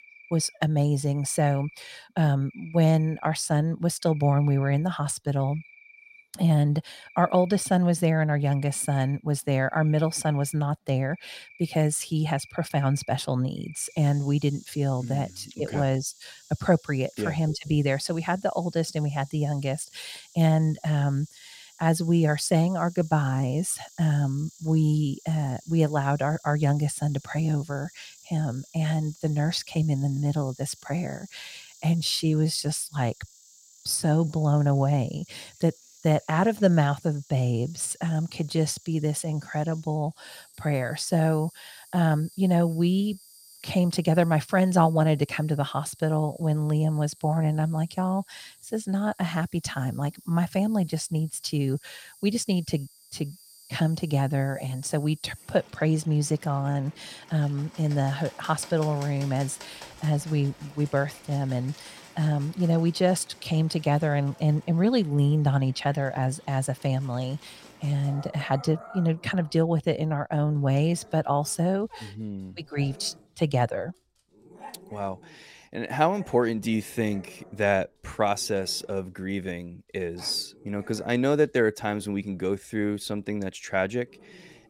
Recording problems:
animal sounds; faint; throughout; 25 dB below the speech

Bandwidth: 16.5 kHz